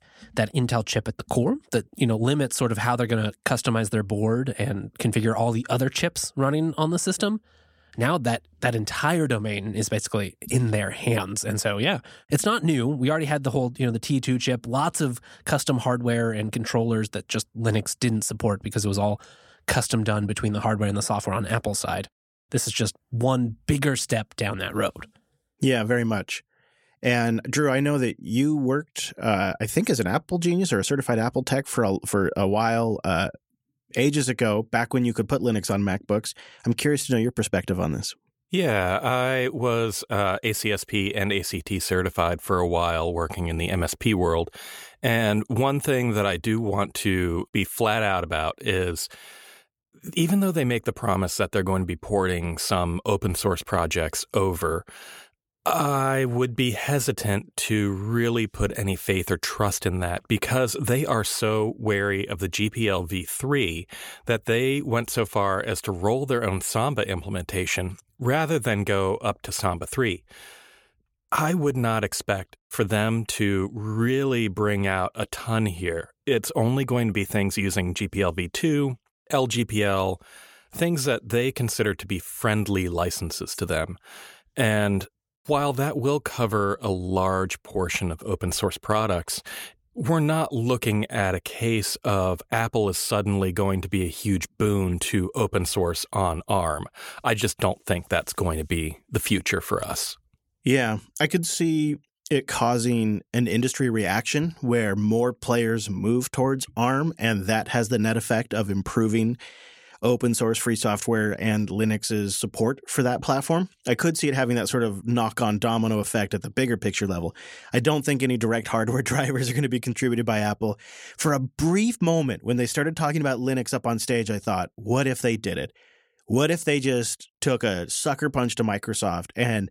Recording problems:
none

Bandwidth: 18 kHz